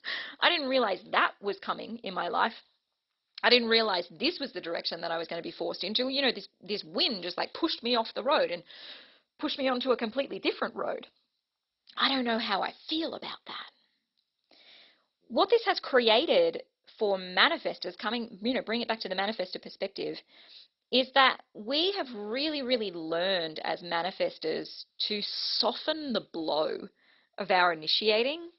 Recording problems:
garbled, watery; badly; nothing above 5.5 kHz
thin; very slightly; fading below 850 Hz

